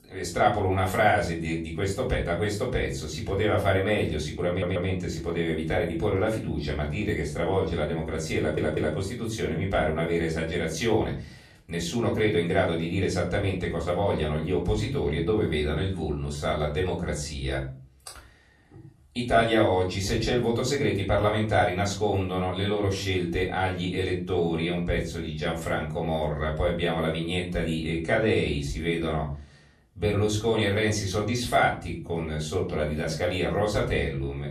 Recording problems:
off-mic speech; far
room echo; slight; dies away in 0.4 s
audio stuttering; at 4.5 s and at 8.5 s

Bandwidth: 13.5 kHz